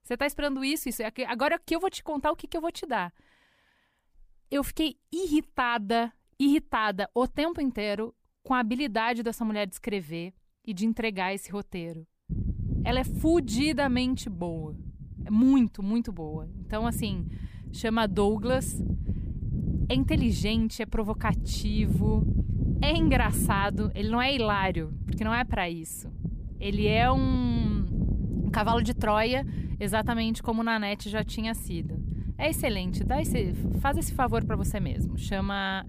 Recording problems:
wind noise on the microphone; occasional gusts; from 12 s on; 15 dB below the speech

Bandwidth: 15 kHz